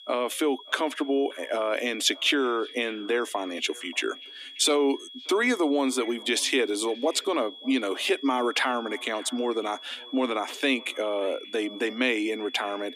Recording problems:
thin; somewhat; fading below 250 Hz
echo of what is said; faint; throughout; 580 ms later, 25 dB below the speech
high-pitched whine; noticeable; throughout; 3.5 kHz, 15 dB below the speech

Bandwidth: 14.5 kHz